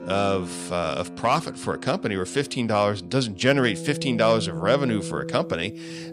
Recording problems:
background music; noticeable; throughout; 10 dB below the speech

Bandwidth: 15.5 kHz